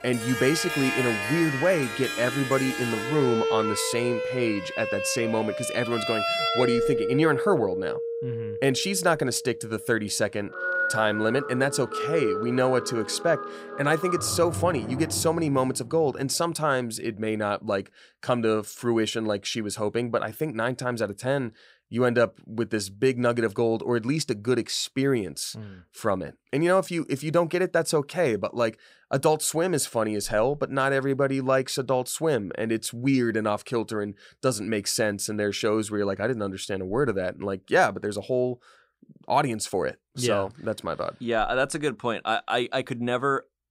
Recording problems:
background music; loud; until 15 s; 4 dB below the speech

